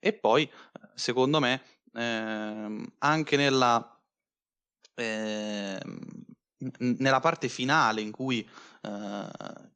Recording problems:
none

